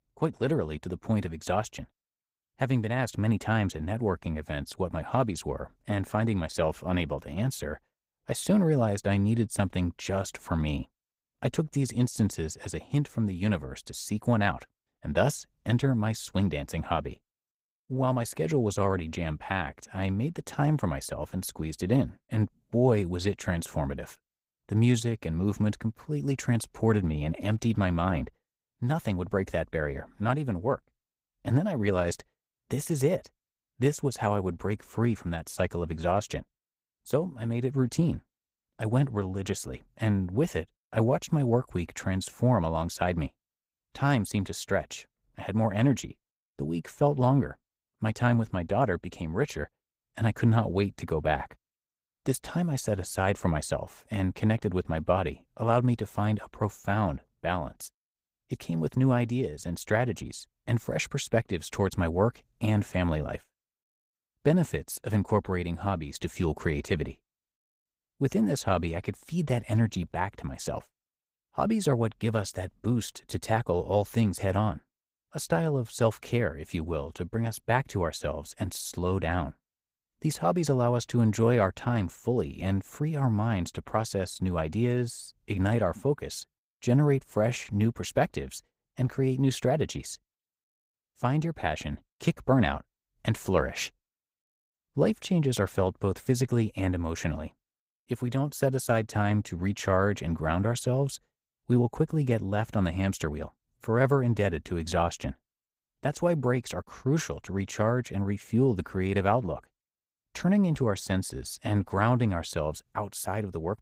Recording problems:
garbled, watery; slightly; nothing above 15.5 kHz

